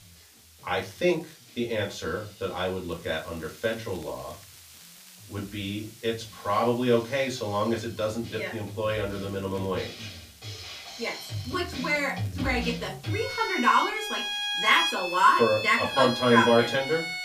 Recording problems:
off-mic speech; far
room echo; very slight; dies away in 0.2 s
background music; loud; throughout; 5 dB below the speech
hiss; faint; throughout; 25 dB below the speech
crackling; faint; 4 times, first at 1 s; 30 dB below the speech

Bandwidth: 15 kHz